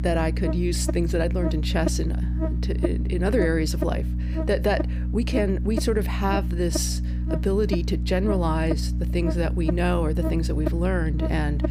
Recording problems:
electrical hum; loud; throughout; 60 Hz, 7 dB below the speech

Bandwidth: 15 kHz